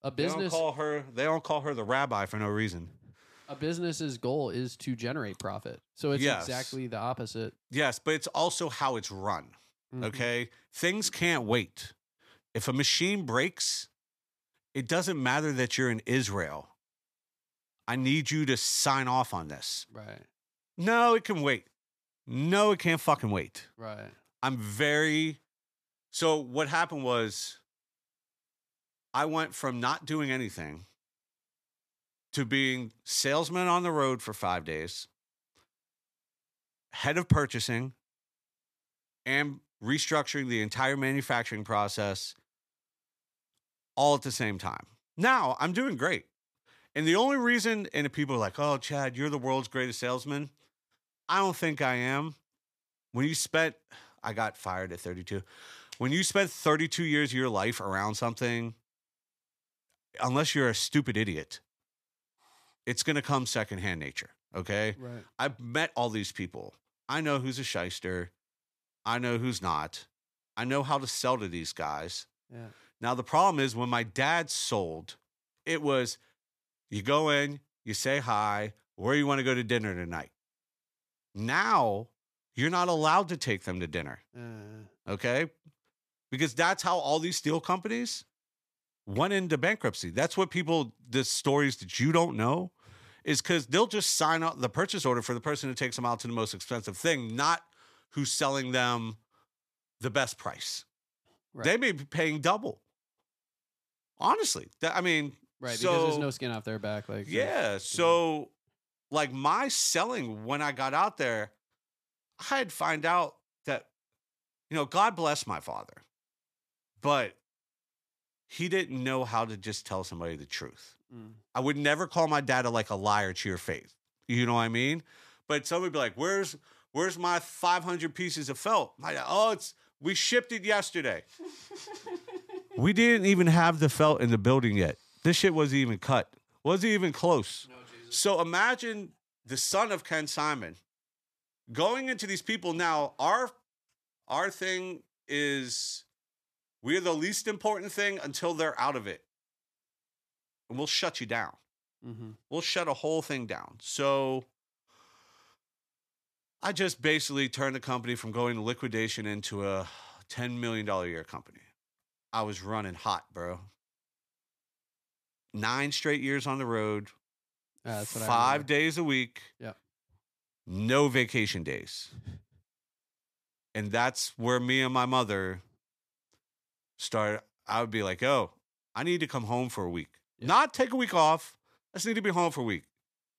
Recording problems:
none

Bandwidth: 14.5 kHz